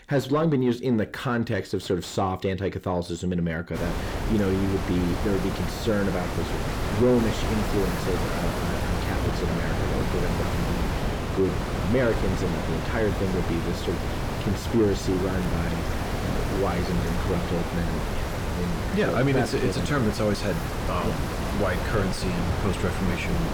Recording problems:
distortion; slight; 10 dB below the speech
wind noise on the microphone; heavy; from 4 s on; 2 dB below the speech

